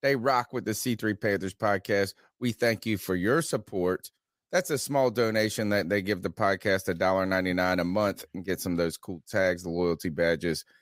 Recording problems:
none

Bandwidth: 15.5 kHz